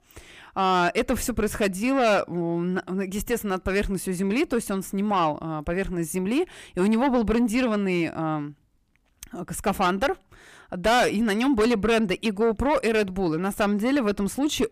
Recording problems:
distortion; heavy; 8 dB below the speech

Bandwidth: 15 kHz